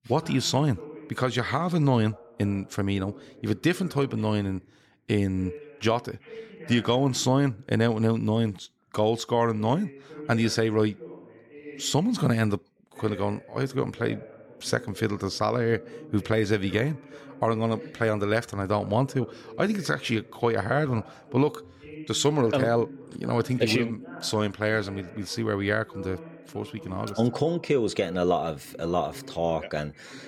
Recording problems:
voice in the background; noticeable; throughout; 20 dB below the speech

